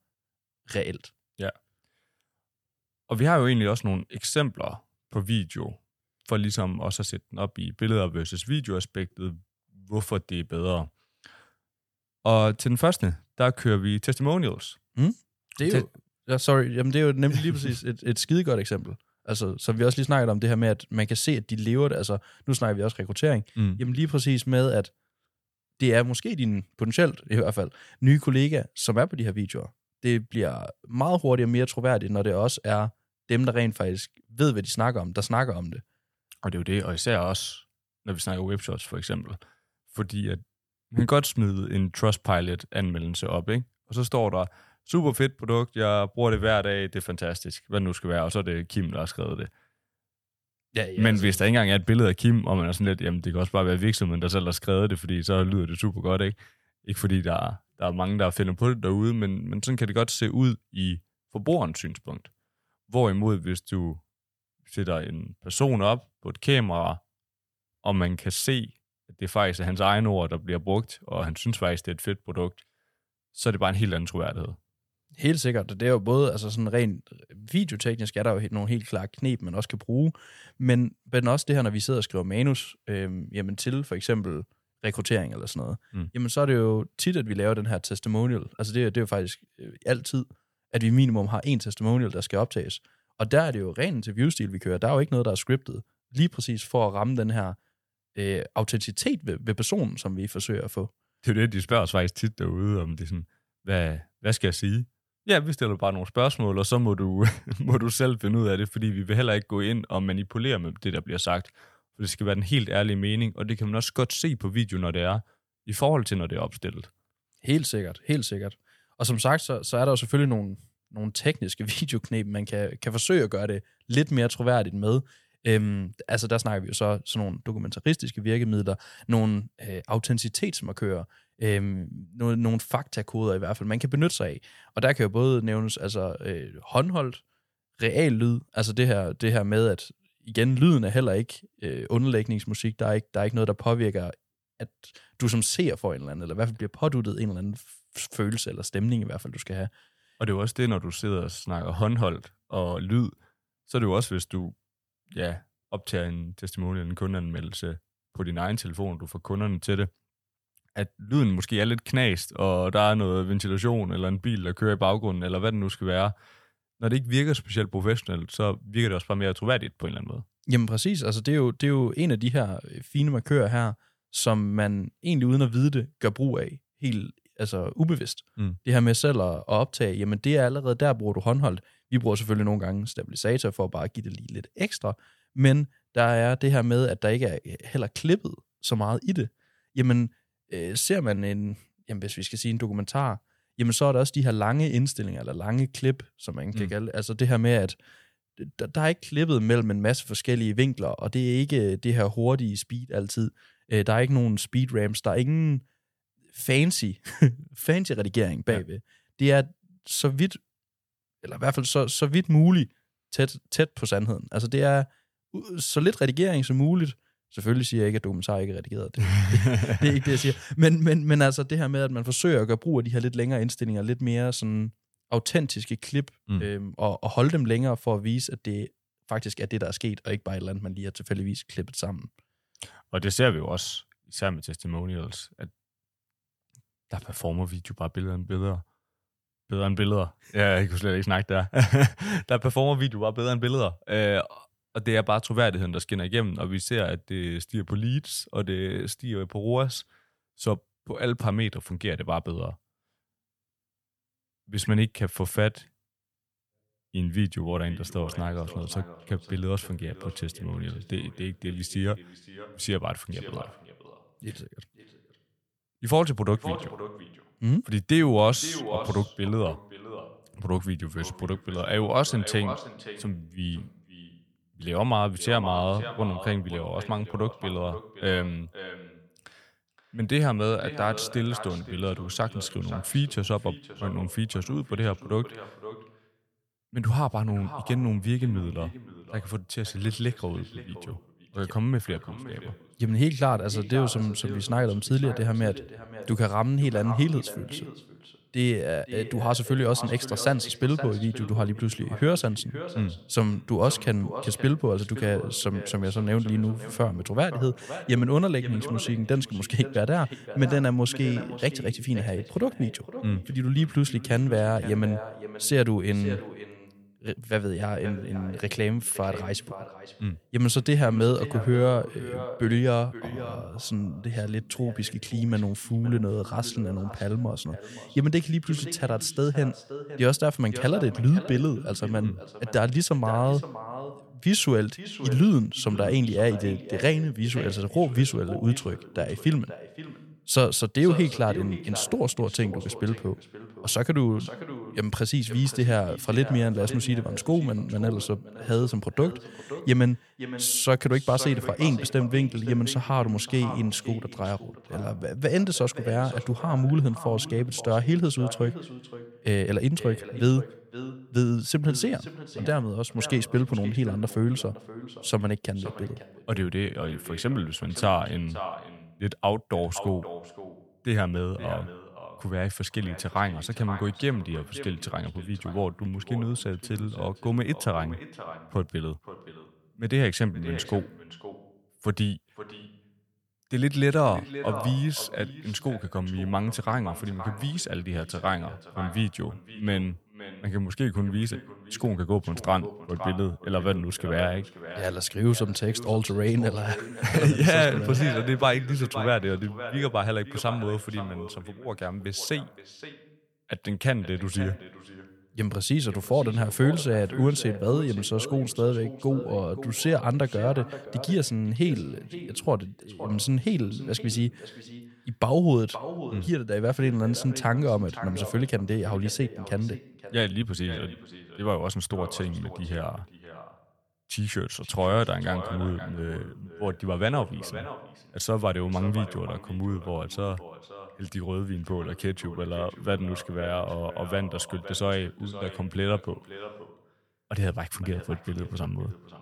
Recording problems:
echo of what is said; noticeable; from 4:17 on; 520 ms later, 15 dB below the speech

